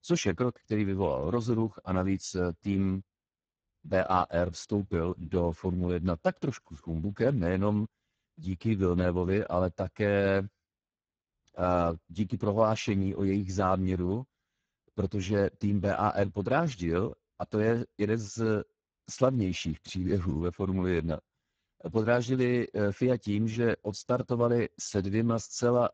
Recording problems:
garbled, watery; badly

